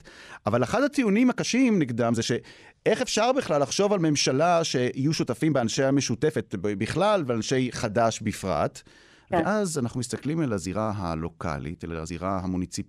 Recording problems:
uneven, jittery; strongly; from 1 to 12 s

